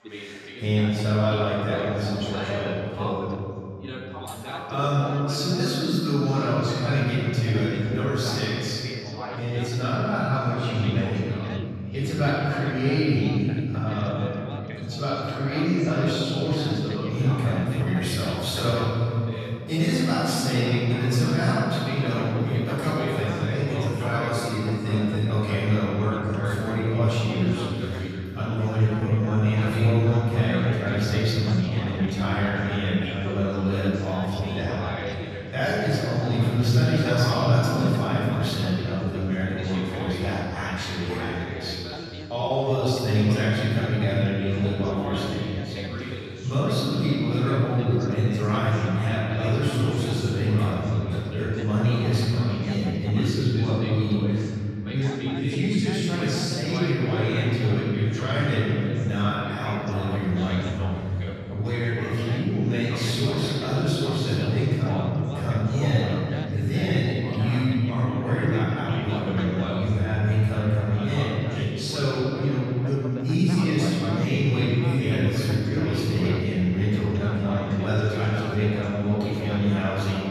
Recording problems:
room echo; strong; dies away in 2.9 s
off-mic speech; far
background chatter; noticeable; throughout; 2 voices, 10 dB below the speech
uneven, jittery; strongly; from 29 to 43 s

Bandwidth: 13.5 kHz